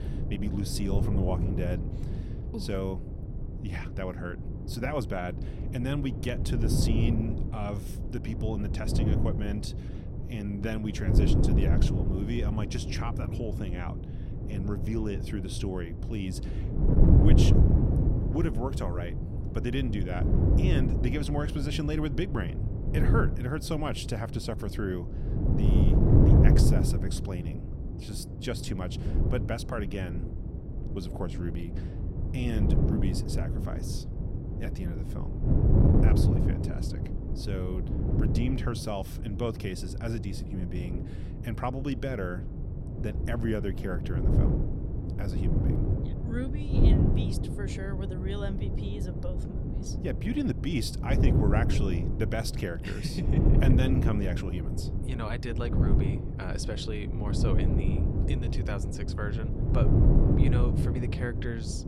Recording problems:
wind noise on the microphone; heavy; 1 dB below the speech

